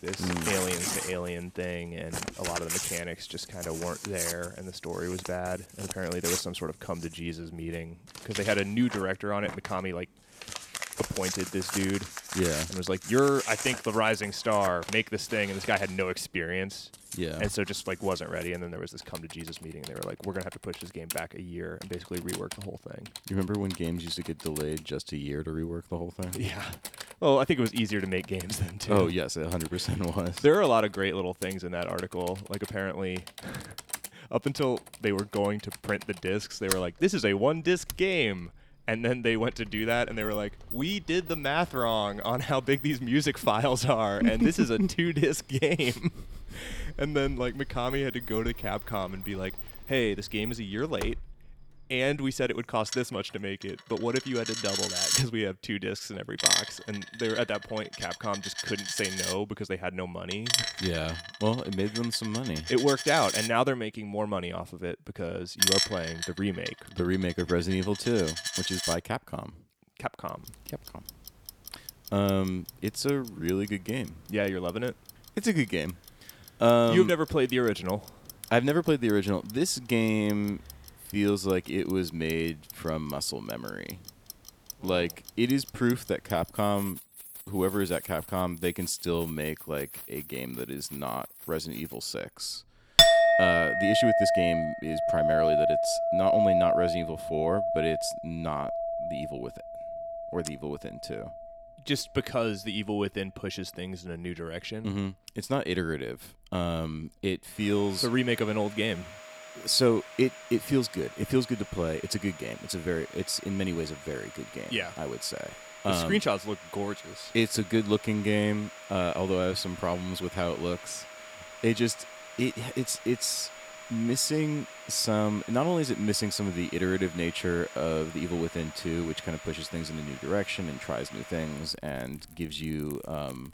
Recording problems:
household noises; loud; throughout; 3 dB below the speech

